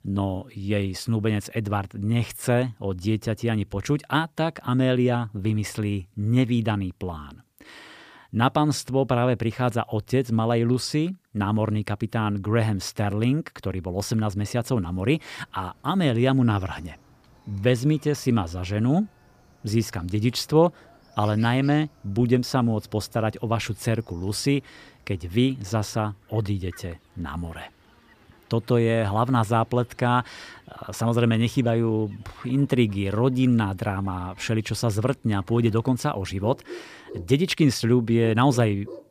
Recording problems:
animal sounds; faint; from 15 s on; 25 dB below the speech

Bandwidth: 15 kHz